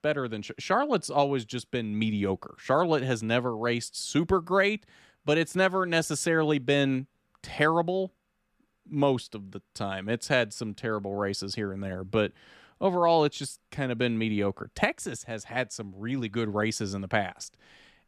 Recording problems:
none

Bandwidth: 14 kHz